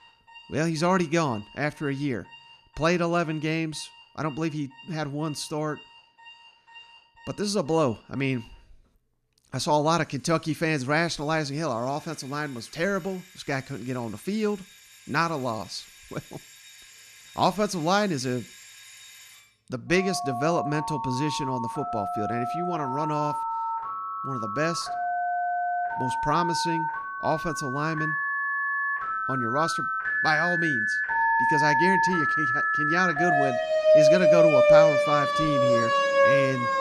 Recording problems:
alarms or sirens; very loud; throughout; 4 dB above the speech

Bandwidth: 14.5 kHz